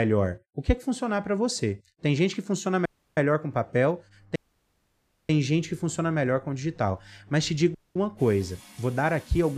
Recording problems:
household noises; faint; from 4 s on; 25 dB below the speech
abrupt cut into speech; at the start and the end
audio cutting out; at 3 s, at 4.5 s for 1 s and at 8 s

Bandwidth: 15 kHz